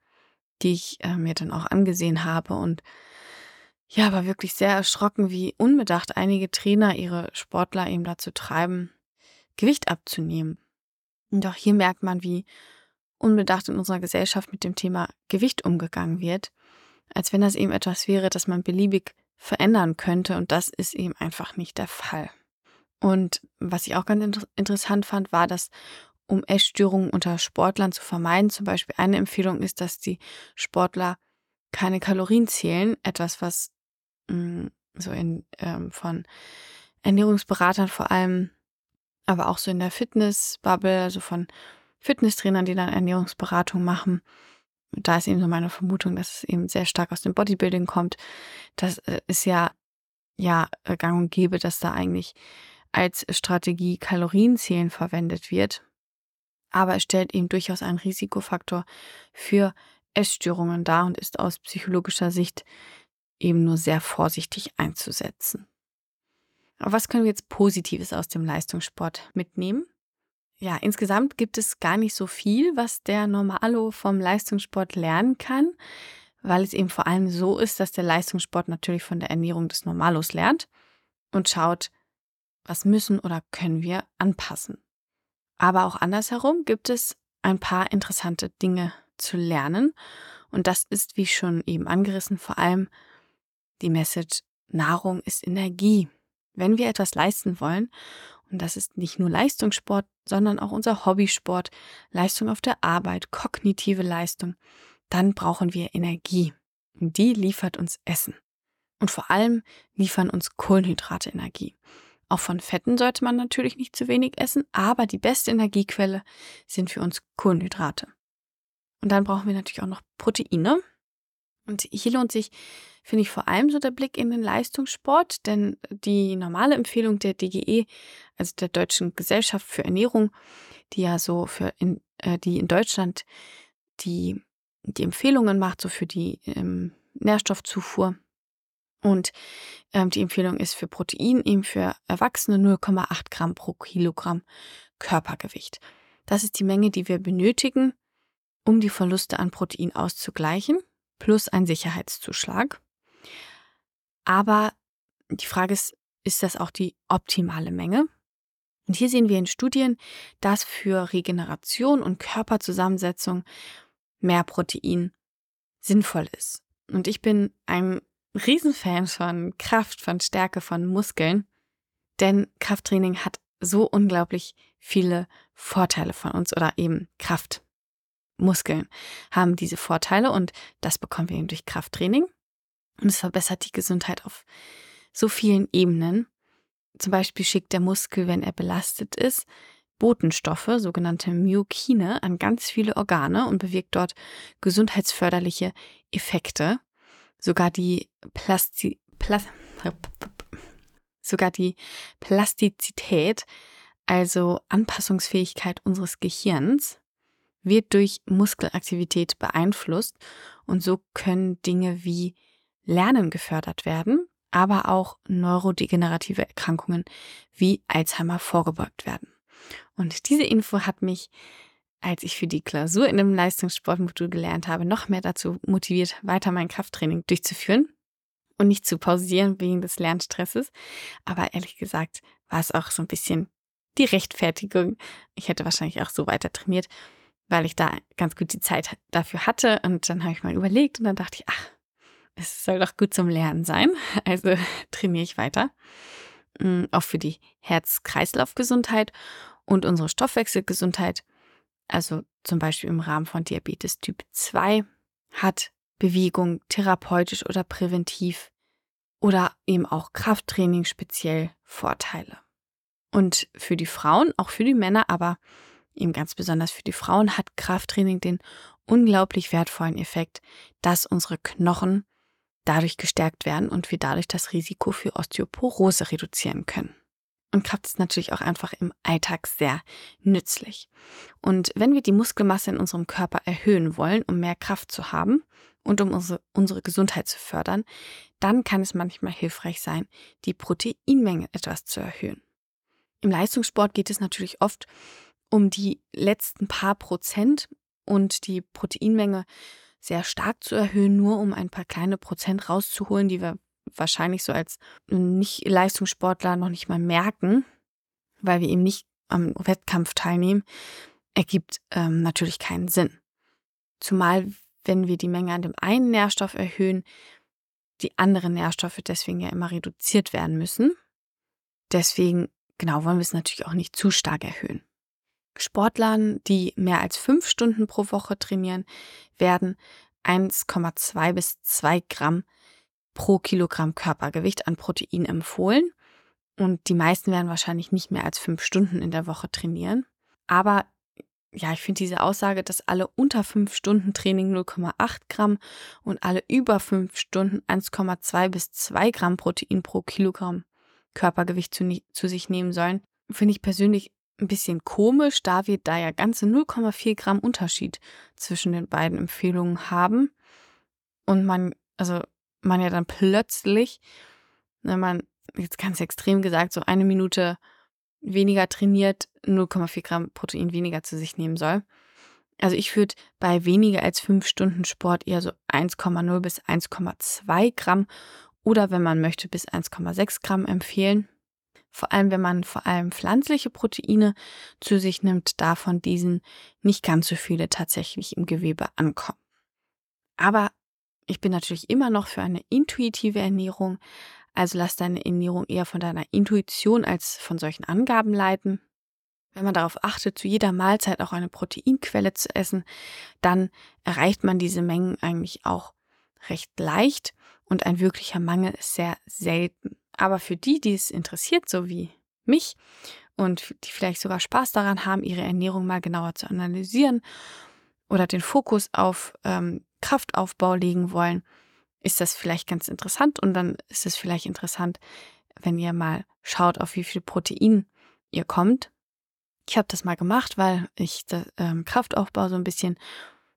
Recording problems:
none

